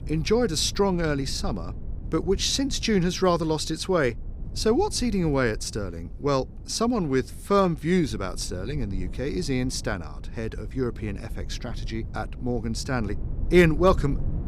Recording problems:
low rumble; faint; throughout; 25 dB below the speech

